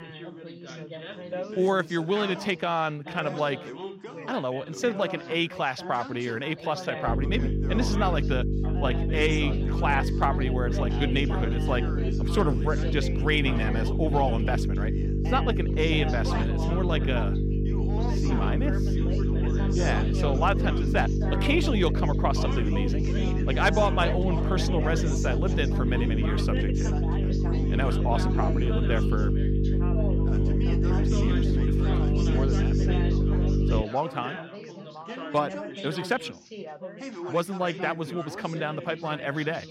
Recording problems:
electrical hum; loud; from 7 to 34 s; 50 Hz, 6 dB below the speech
background chatter; loud; throughout; 4 voices, 8 dB below the speech

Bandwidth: 16 kHz